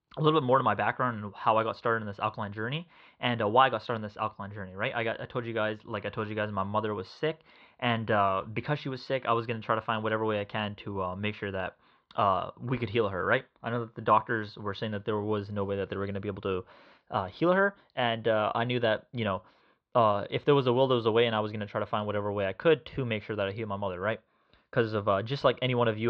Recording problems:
muffled; slightly; fading above 4 kHz
abrupt cut into speech; at the end

